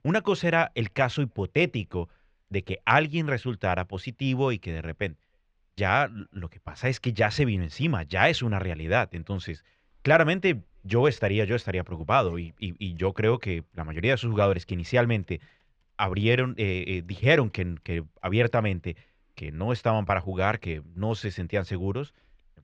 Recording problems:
muffled; slightly; fading above 2.5 kHz

